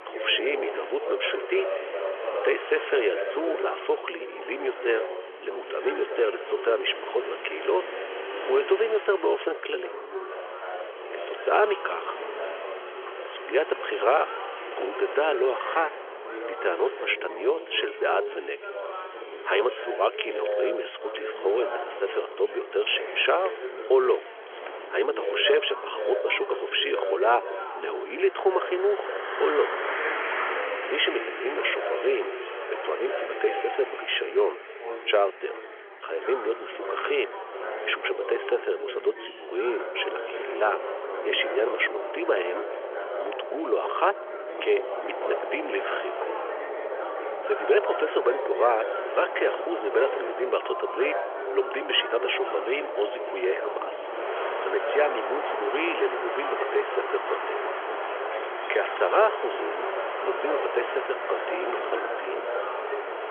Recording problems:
phone-call audio; nothing above 3.5 kHz
traffic noise; loud; throughout; 8 dB below the speech
background chatter; loud; throughout; 3 voices, 8 dB below the speech
wind noise on the microphone; occasional gusts; 15 dB below the speech

